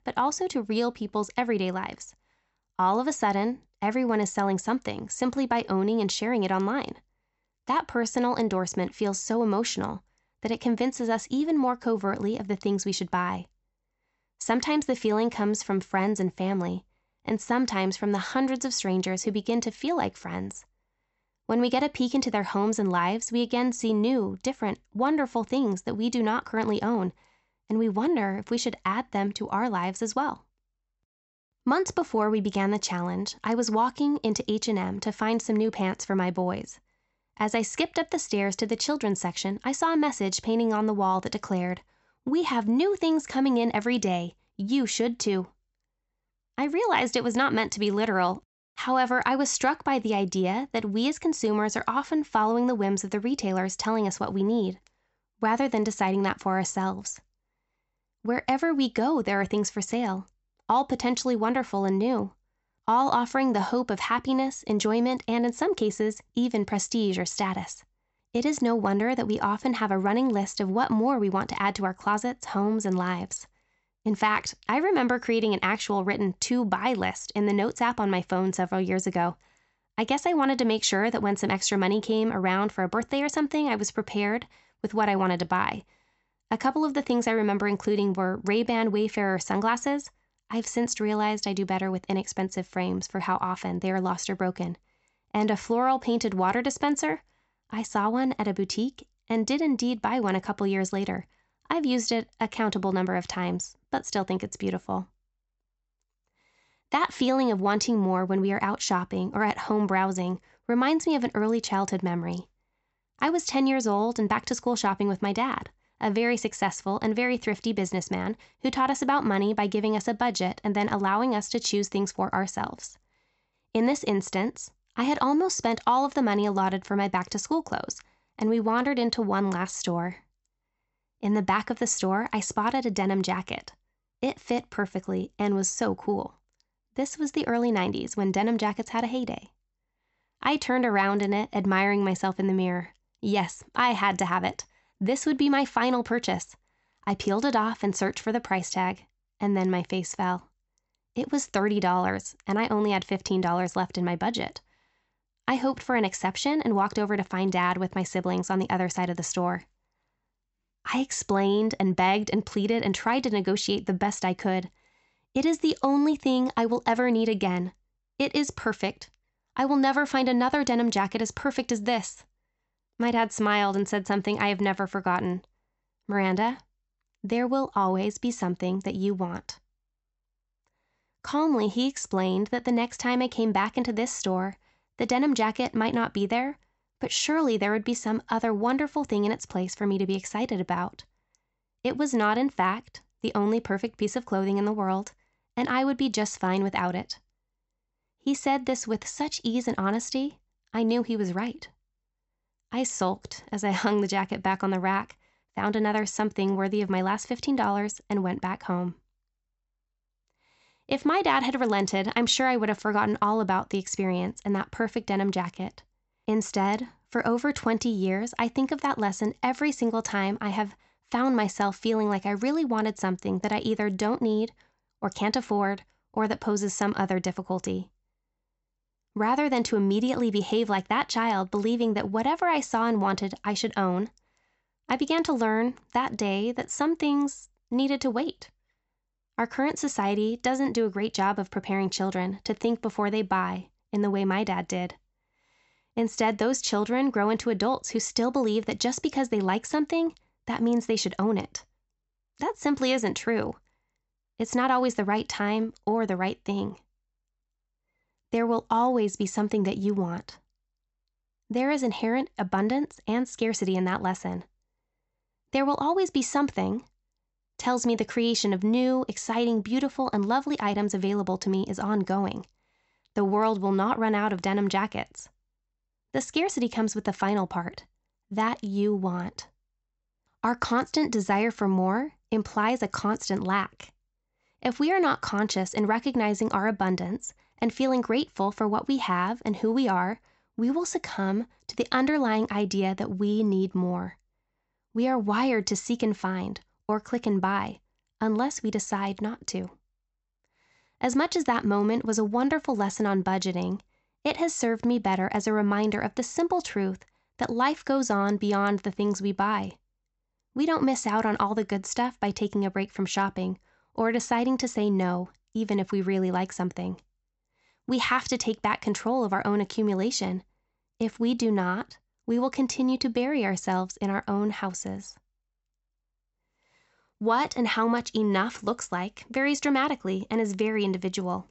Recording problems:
high frequencies cut off; noticeable; nothing above 7.5 kHz

